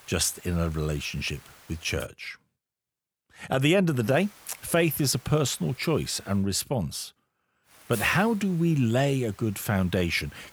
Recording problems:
hiss; faint; until 2 s, from 4 to 6.5 s and from 7.5 s on; 20 dB below the speech

